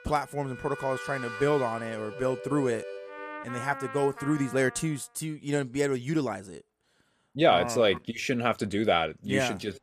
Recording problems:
background music; noticeable; until 4.5 s; 10 dB below the speech

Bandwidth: 14.5 kHz